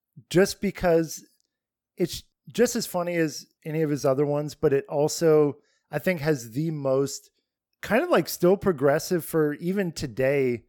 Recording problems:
none

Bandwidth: 17.5 kHz